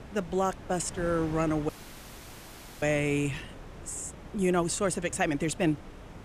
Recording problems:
wind noise on the microphone; occasional gusts; 15 dB below the speech
train or aircraft noise; faint; throughout; 30 dB below the speech
audio cutting out; at 1.5 s for 1 s

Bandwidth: 14.5 kHz